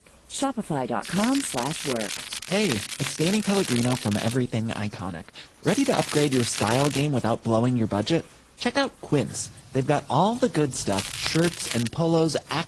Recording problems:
garbled, watery; slightly
crackling; loud; from 1 to 4.5 s, from 5.5 to 7 s and at 11 s; 5 dB below the speech
rain or running water; faint; throughout; 25 dB below the speech

